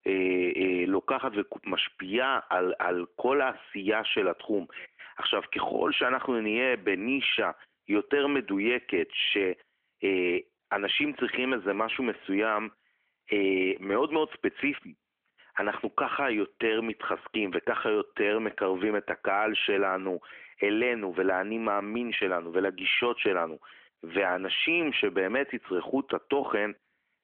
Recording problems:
phone-call audio; nothing above 3.5 kHz

